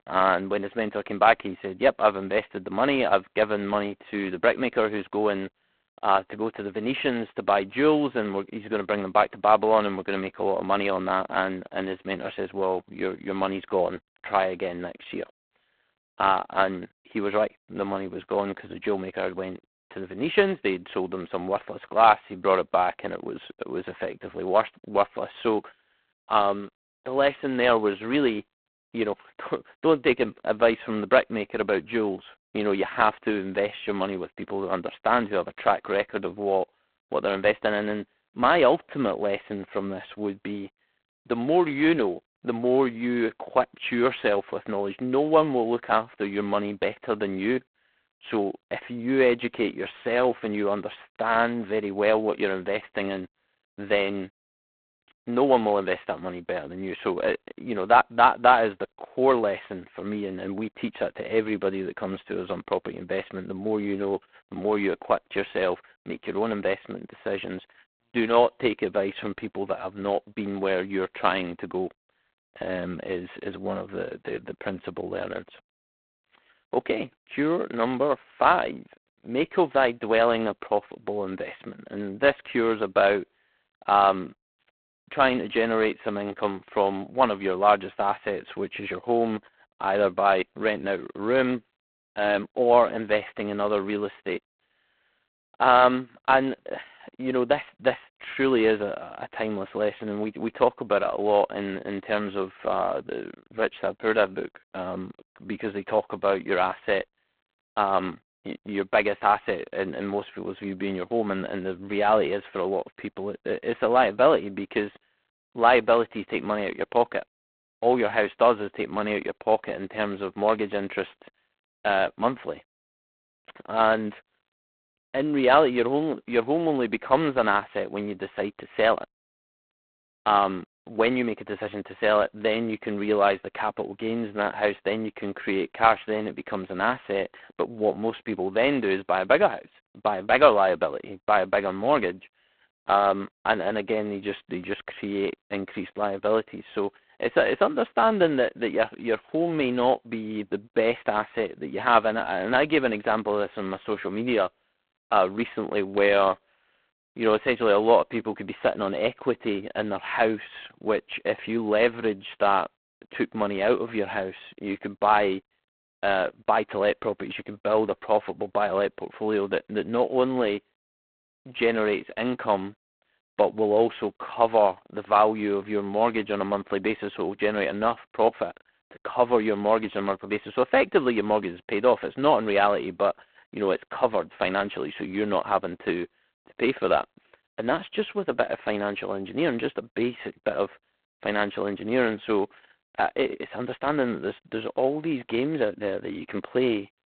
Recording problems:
phone-call audio; poor line; nothing above 4 kHz

